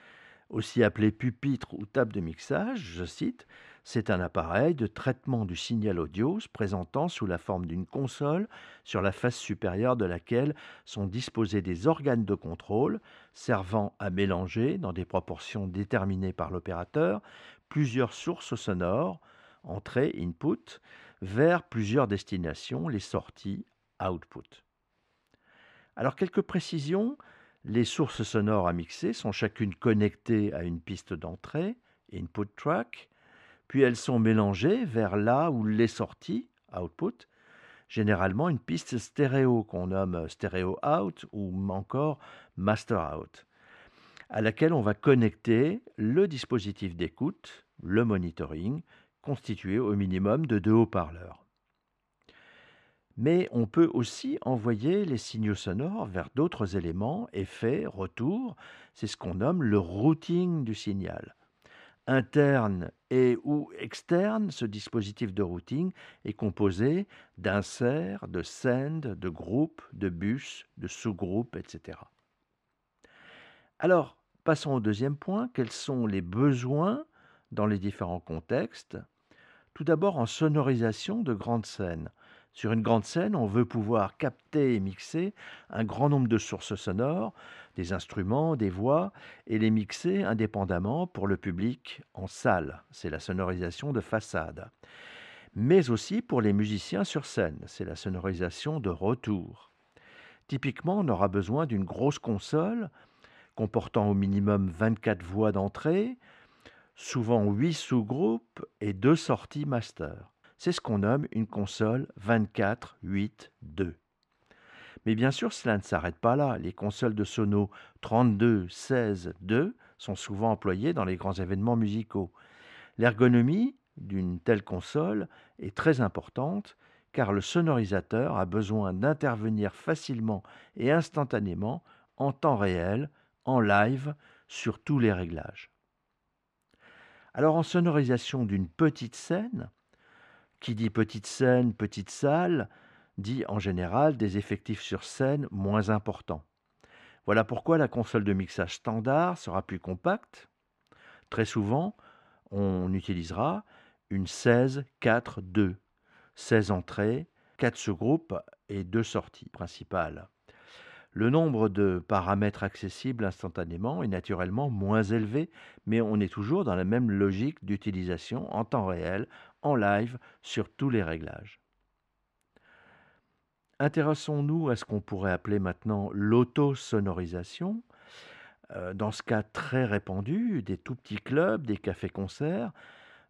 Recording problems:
muffled; slightly; fading above 3 kHz

